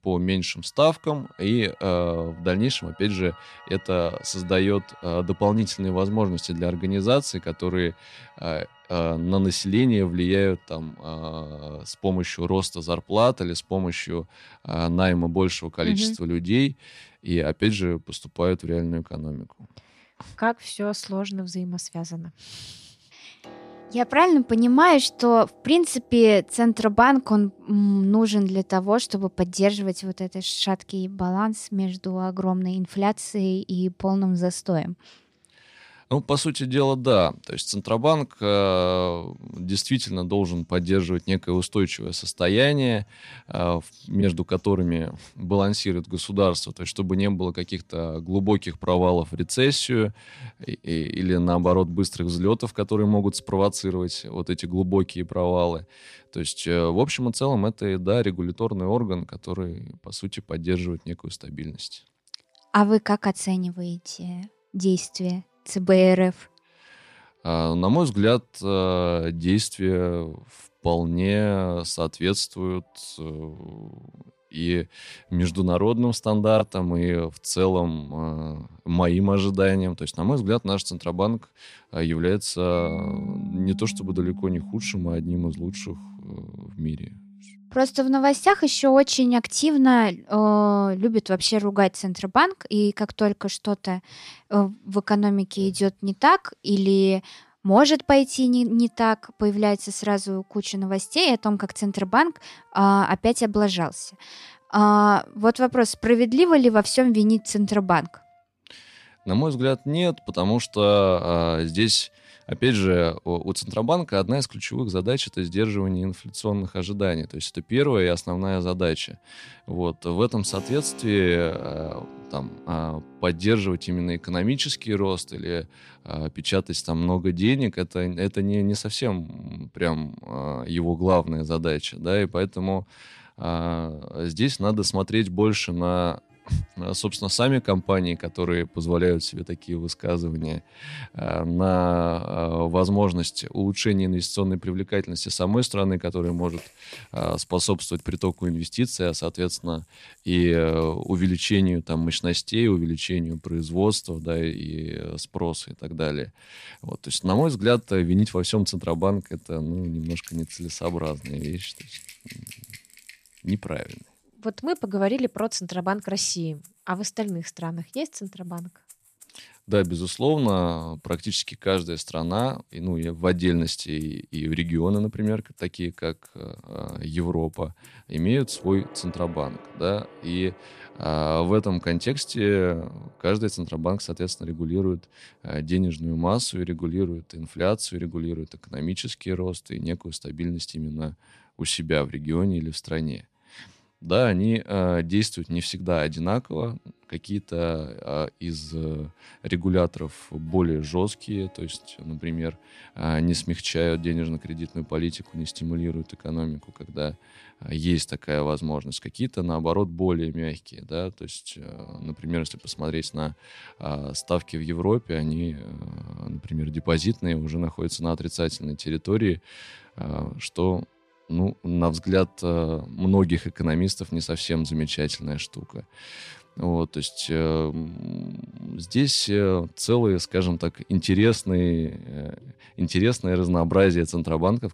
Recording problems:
background music; faint; throughout; 25 dB below the speech

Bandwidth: 14.5 kHz